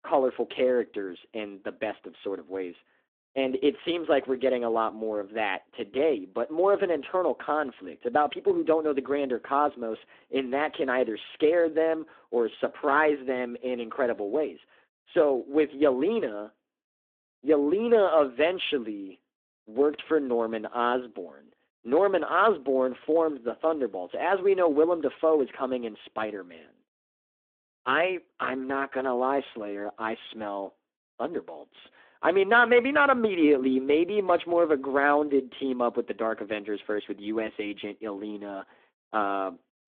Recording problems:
phone-call audio; nothing above 3.5 kHz

